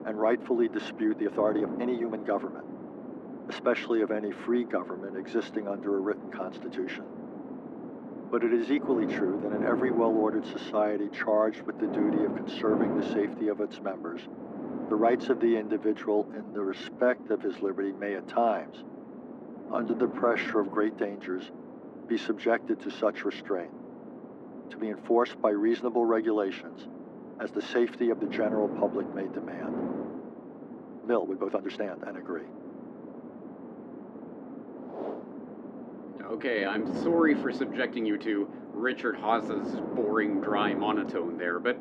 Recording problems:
muffled; very; fading above 1.5 kHz
thin; very slightly; fading below 300 Hz
wind noise on the microphone; occasional gusts; 10 dB below the speech
uneven, jittery; strongly; from 1 to 37 s

